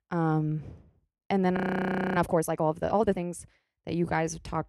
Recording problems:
audio freezing; at 1.5 s for 0.5 s

